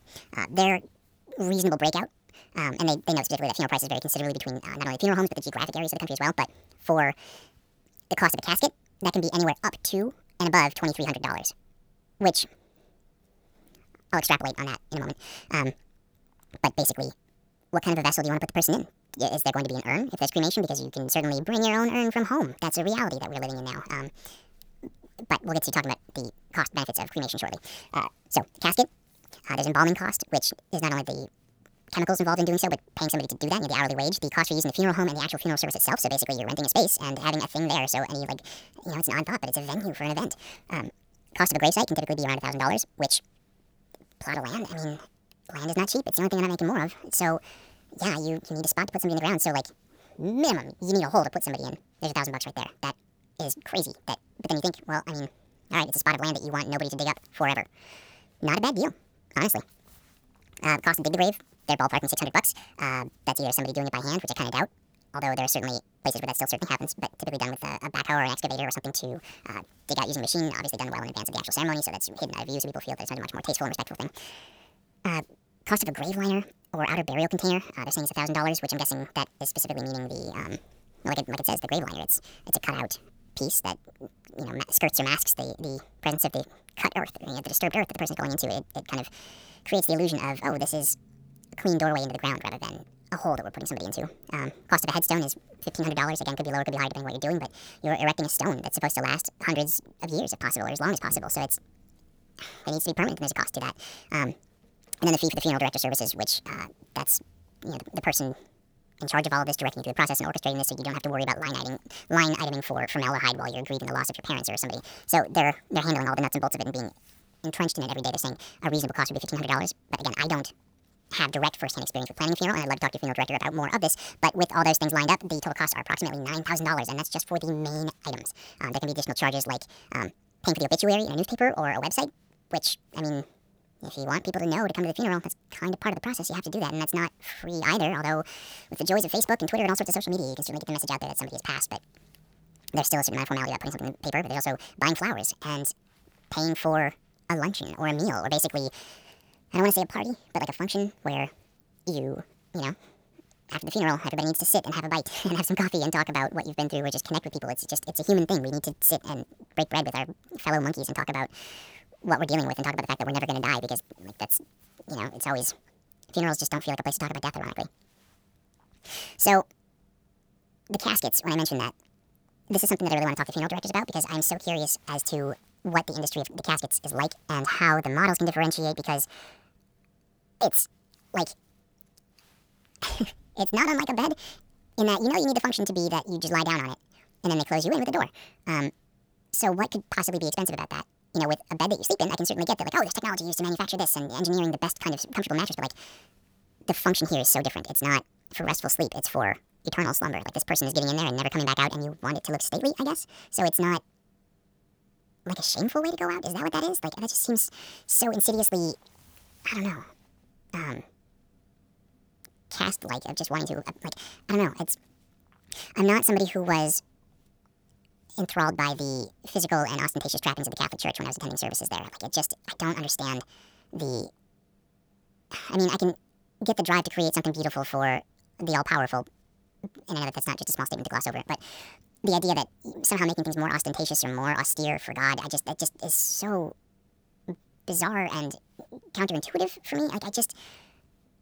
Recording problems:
wrong speed and pitch; too fast and too high; 1.6 times normal speed

